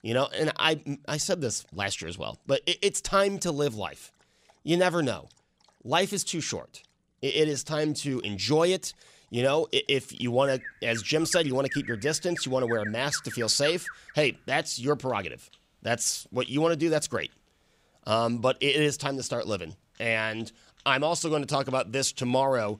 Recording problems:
animal sounds; noticeable; throughout; 10 dB below the speech

